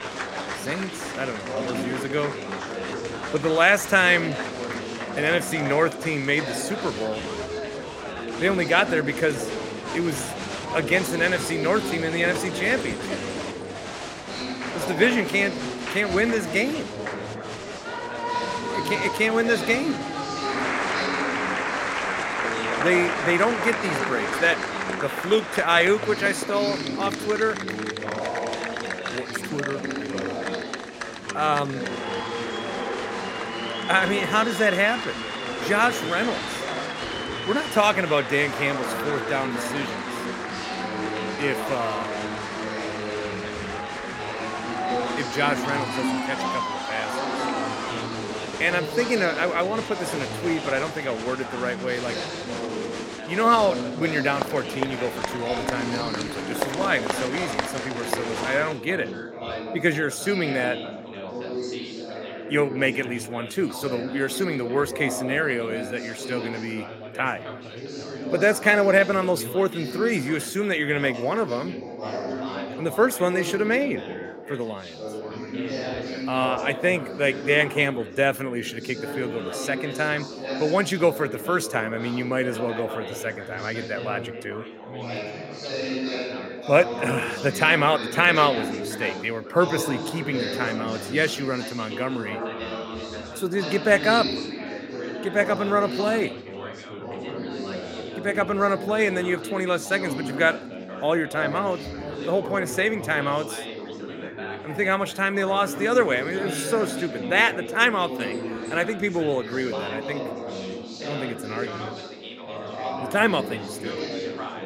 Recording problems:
chatter from many people; loud; throughout; 6 dB below the speech

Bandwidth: 16 kHz